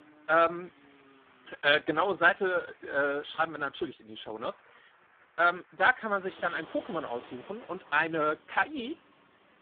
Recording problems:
phone-call audio; poor line
traffic noise; faint; throughout; 25 dB below the speech

